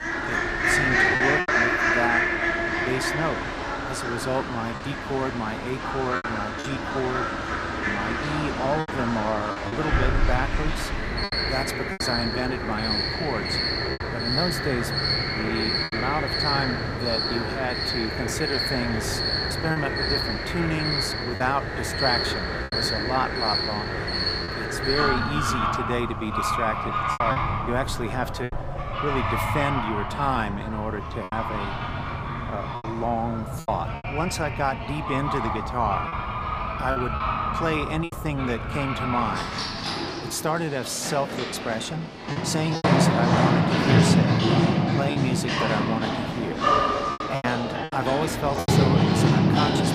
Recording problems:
animal sounds; very loud; throughout; 4 dB above the speech
wind noise on the microphone; occasional gusts; 25 dB below the speech
choppy; occasionally; 4% of the speech affected

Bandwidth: 15 kHz